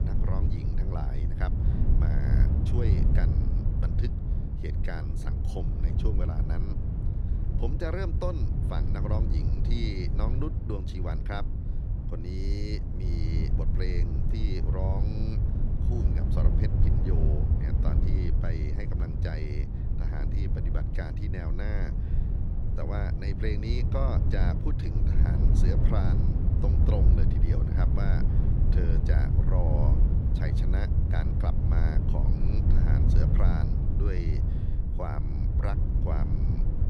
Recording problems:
wind noise on the microphone; heavy; 1 dB below the speech

